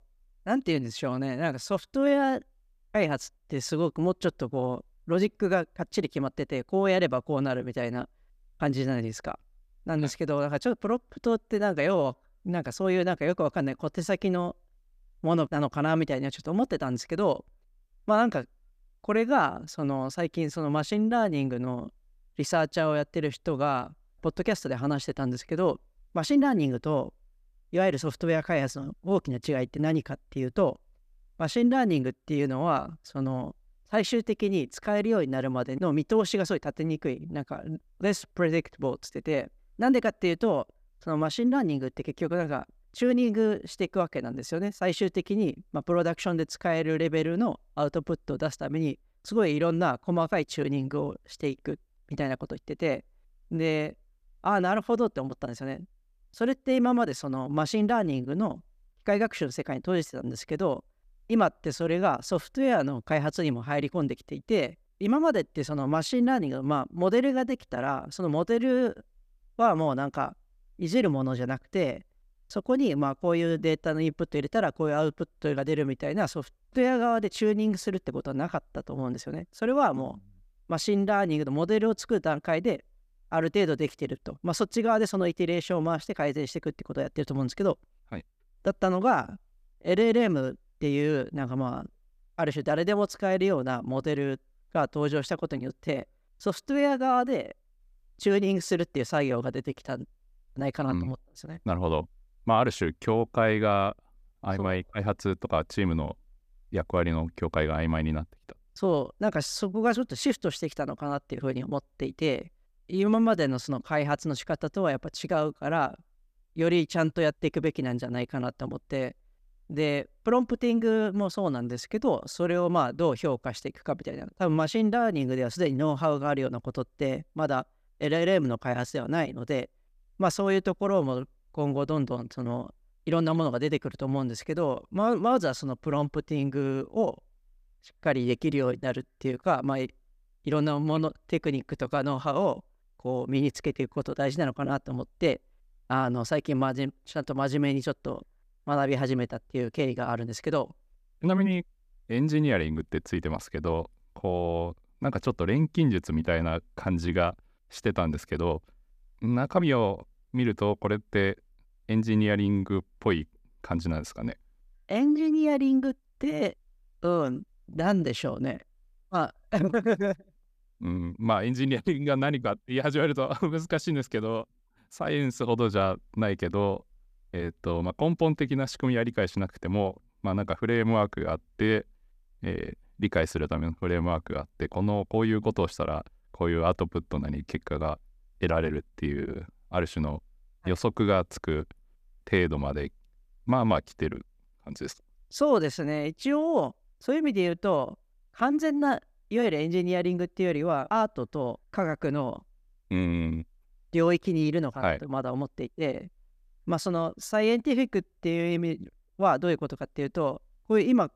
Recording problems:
none

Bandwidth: 14.5 kHz